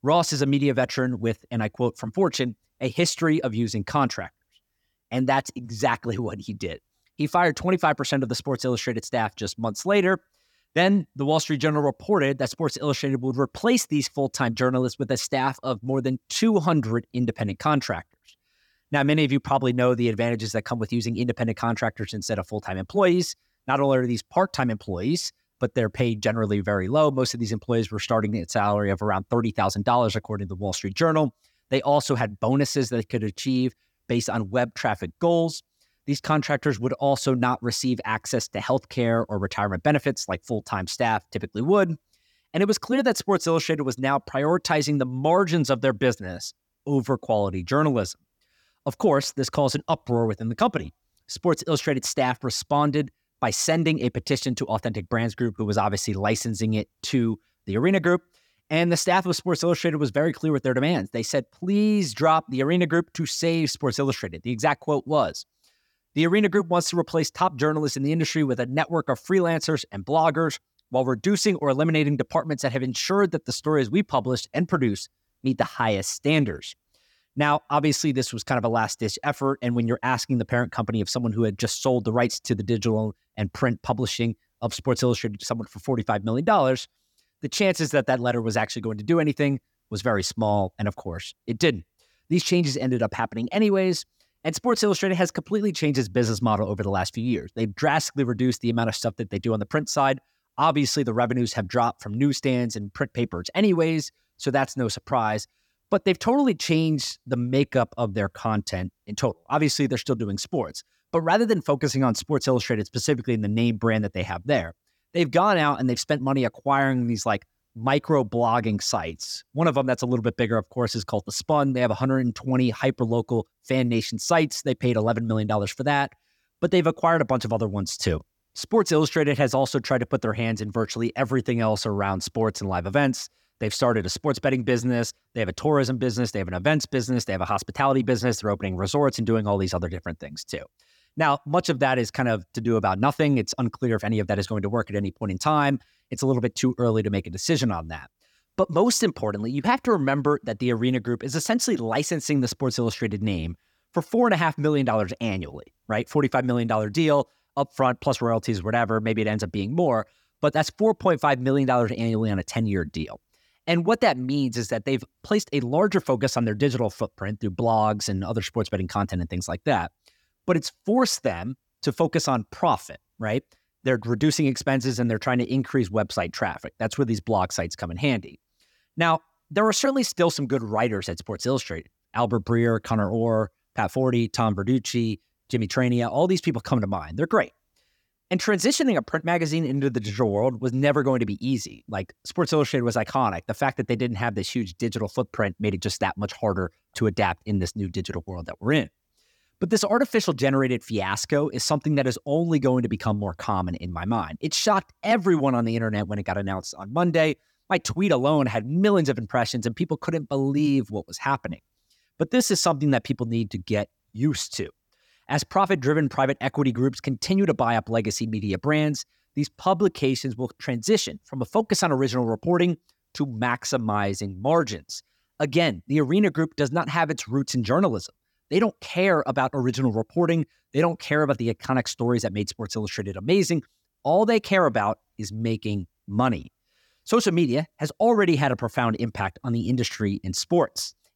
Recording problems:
none

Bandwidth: 18 kHz